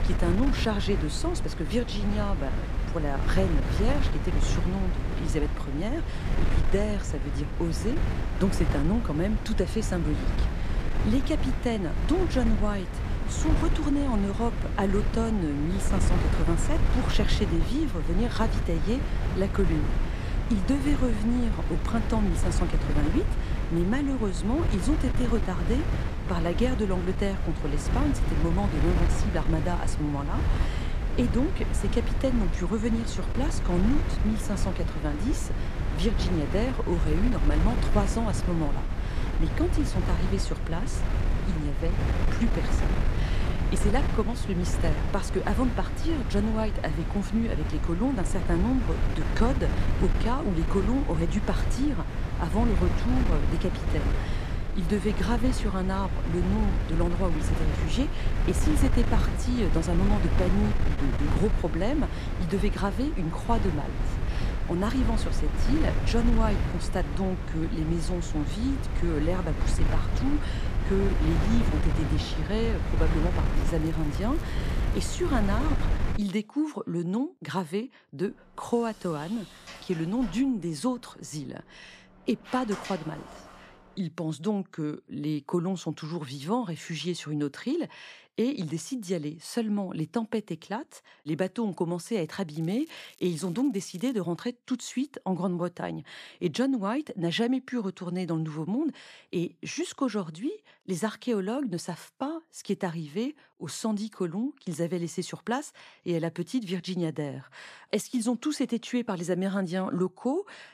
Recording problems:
wind noise on the microphone; heavy; until 1:16; 4 dB below the speech
crackling; faint; from 1:14 to 1:16 and from 1:33 to 1:34; 25 dB below the speech
door banging; noticeable; from 1:19 to 1:24; peak 9 dB below the speech

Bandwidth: 14.5 kHz